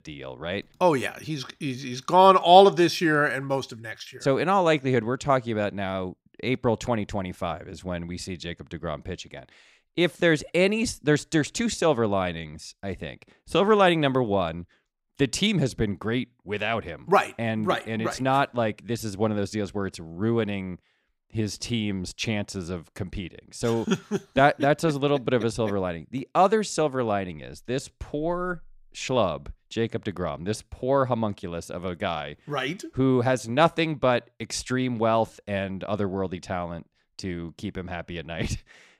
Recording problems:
none

